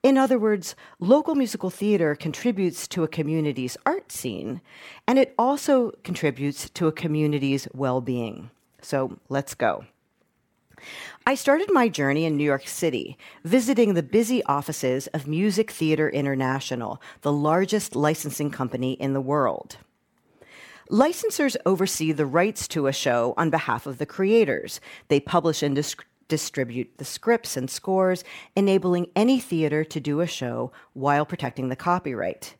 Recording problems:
none

